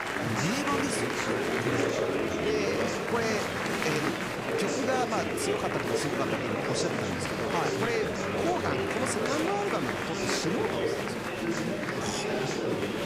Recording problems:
murmuring crowd; very loud; throughout; 4 dB above the speech

